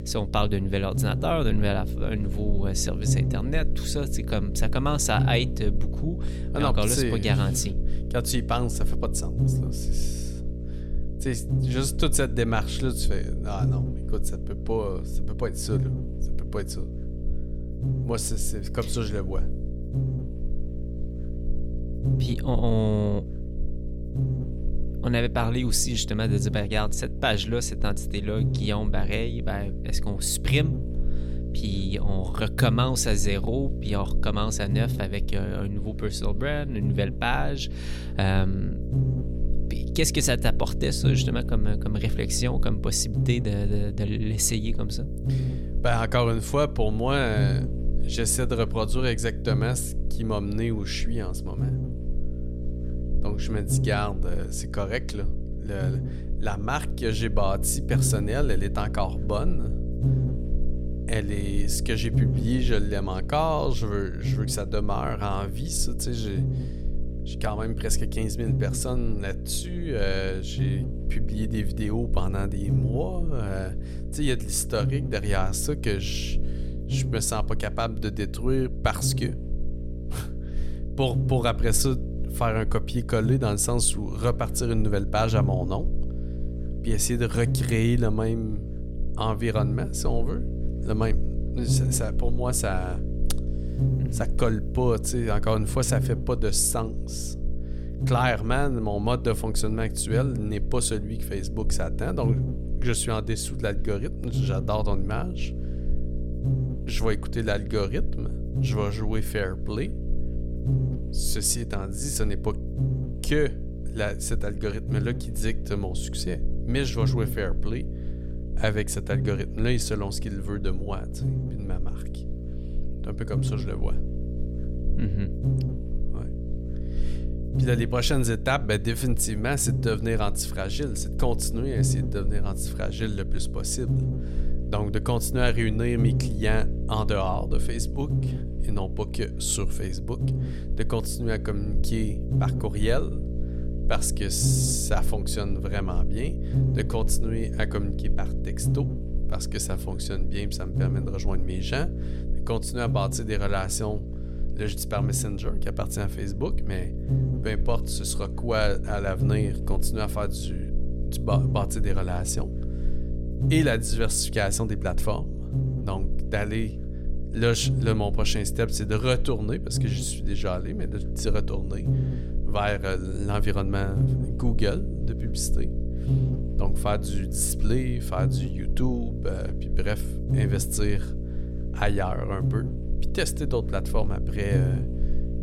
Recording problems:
electrical hum; noticeable; throughout; 60 Hz, 10 dB below the speech

